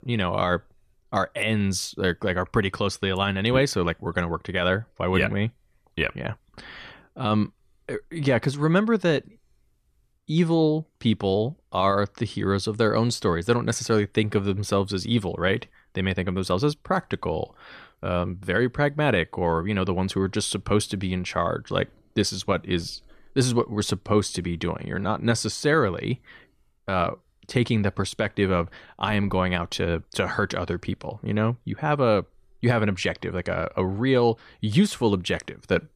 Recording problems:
none

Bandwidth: 14 kHz